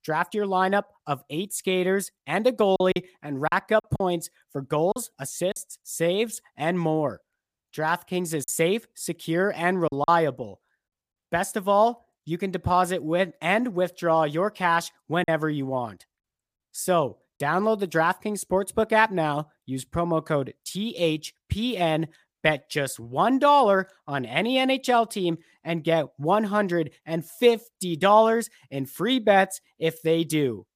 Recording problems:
choppy; very; from 3 to 5.5 s, from 8.5 to 10 s and at 15 s; 7% of the speech affected

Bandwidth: 15 kHz